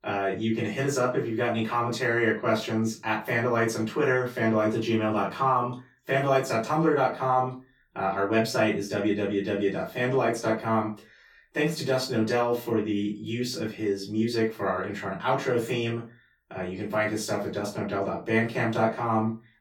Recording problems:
off-mic speech; far
room echo; slight; dies away in 0.2 s

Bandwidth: 18 kHz